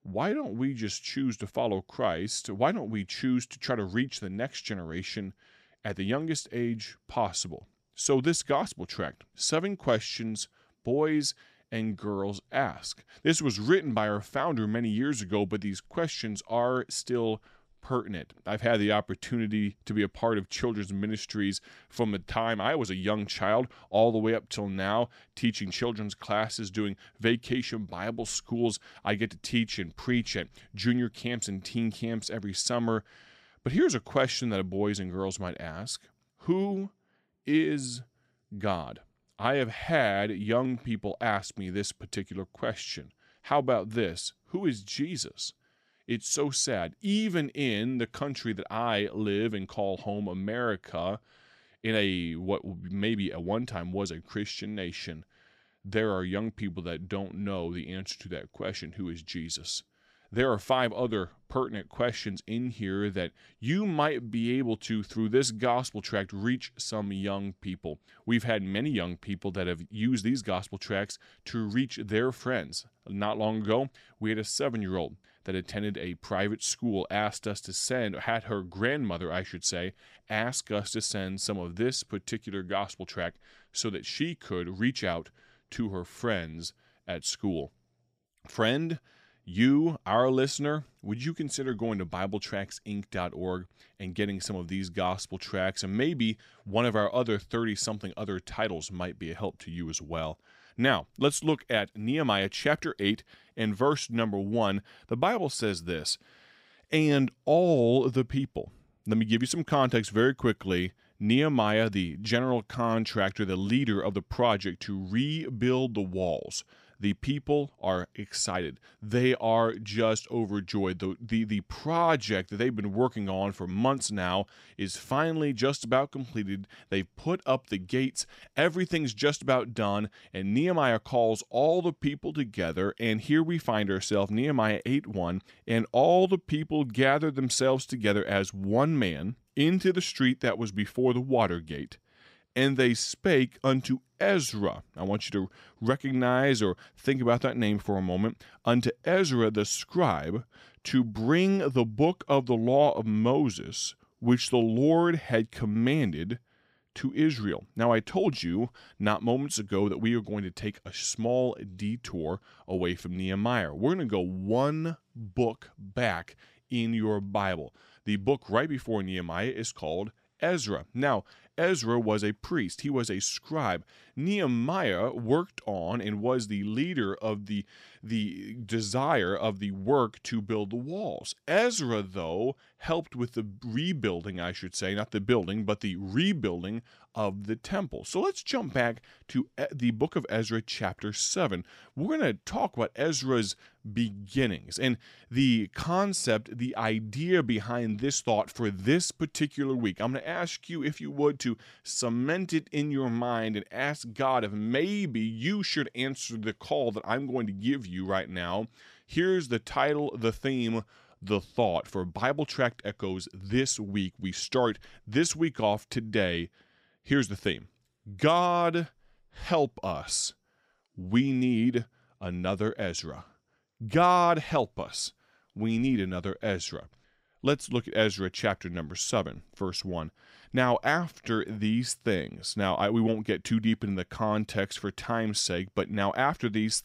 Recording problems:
none

